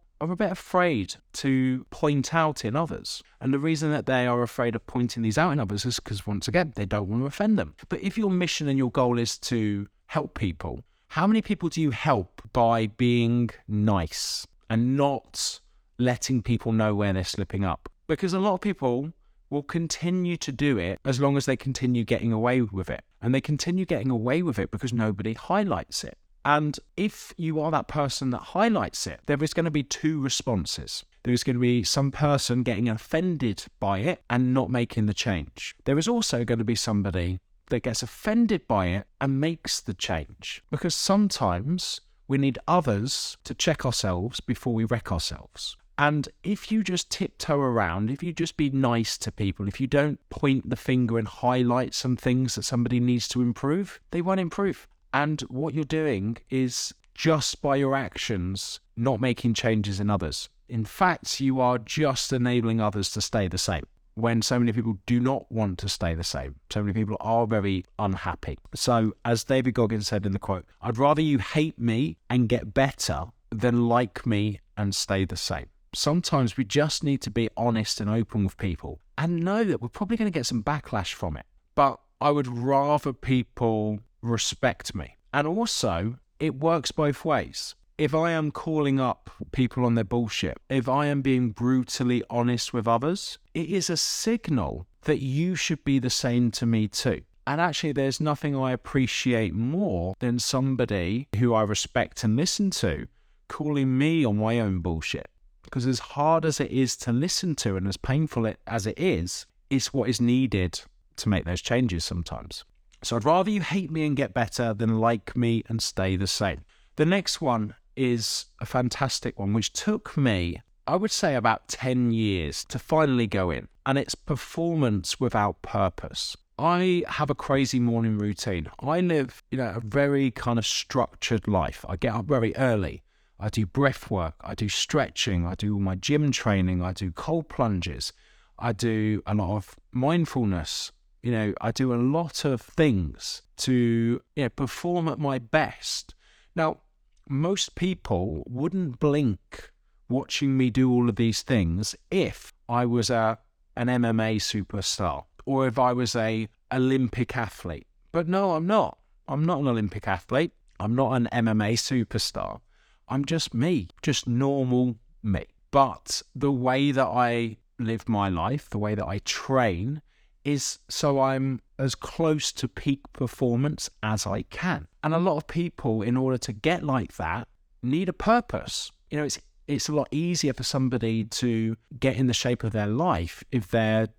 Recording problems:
none

